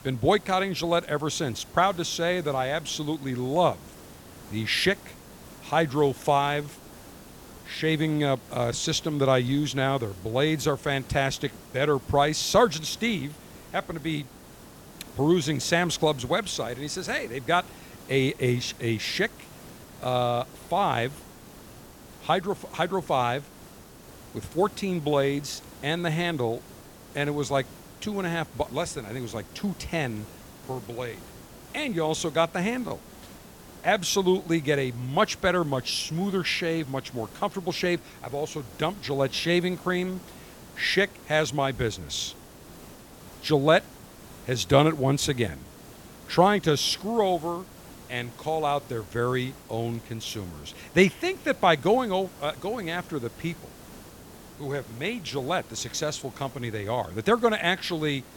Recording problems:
hiss; noticeable; throughout; 20 dB below the speech

